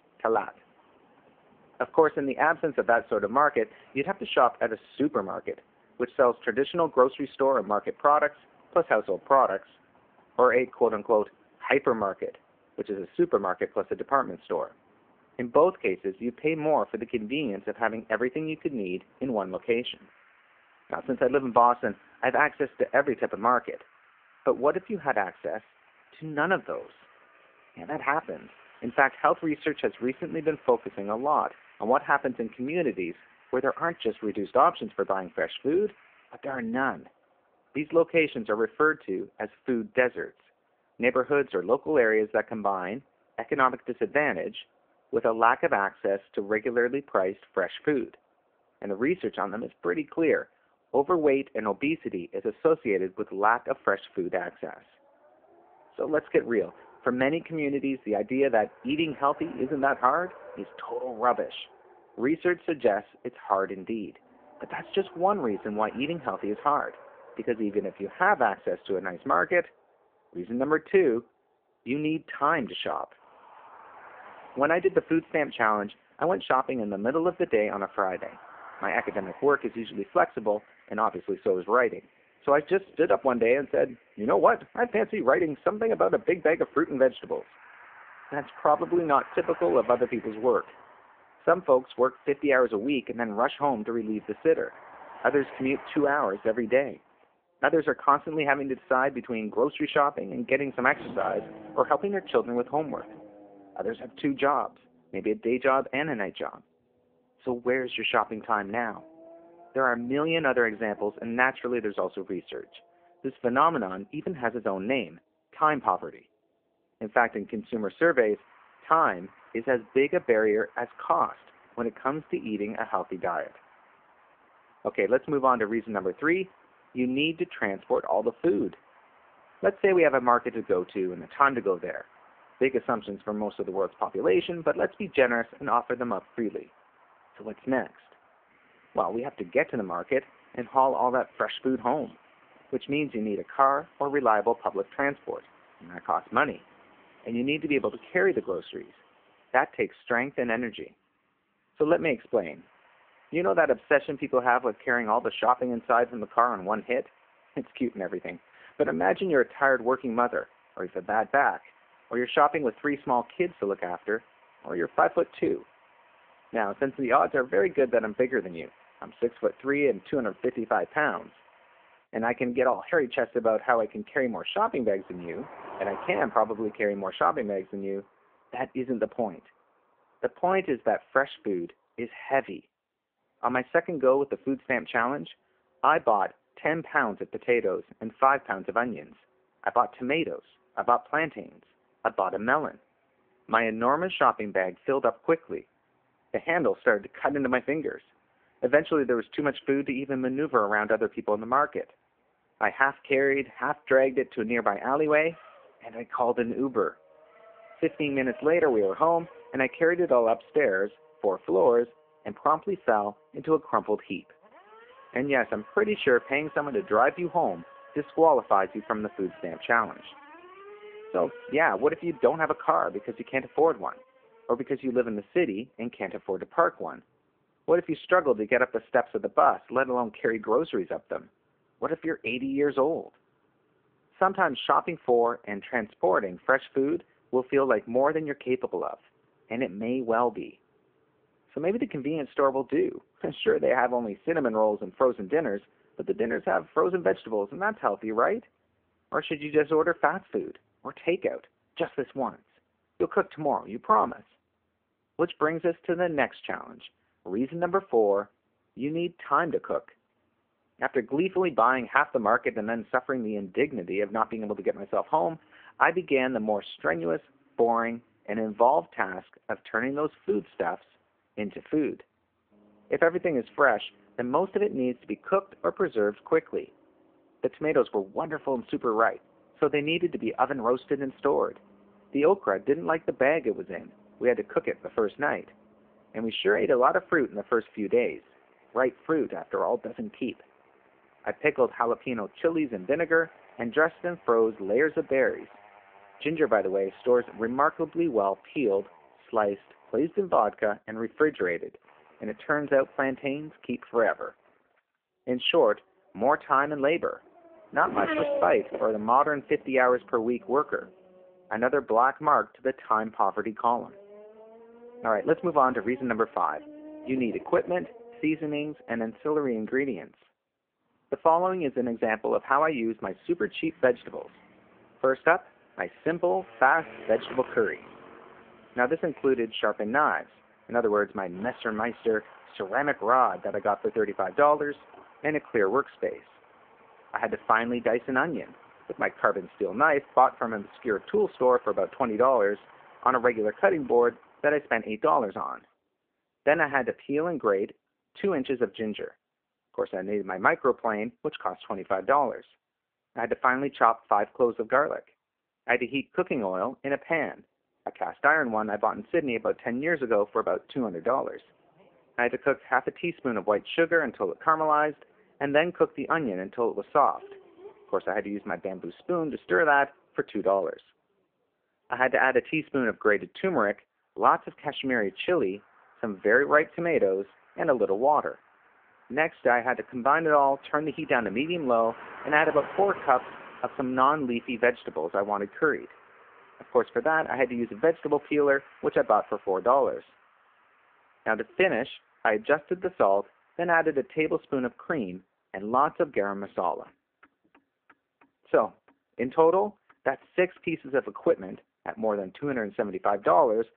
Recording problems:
phone-call audio; poor line
traffic noise; faint; throughout; 25 dB below the speech

